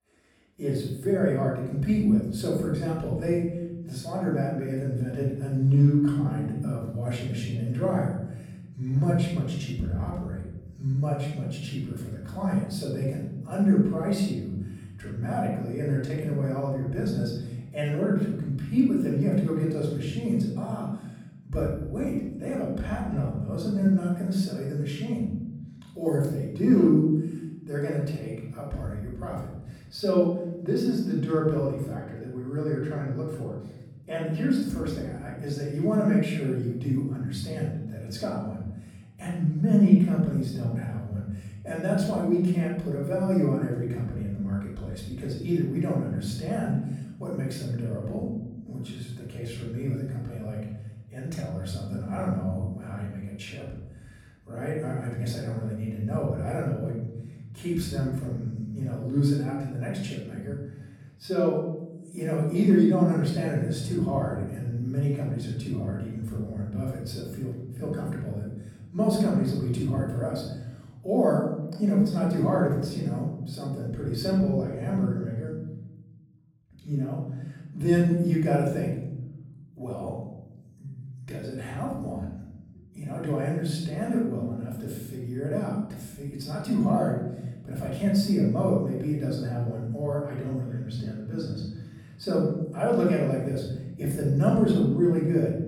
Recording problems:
off-mic speech; far
room echo; noticeable; dies away in 1.3 s

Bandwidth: 17.5 kHz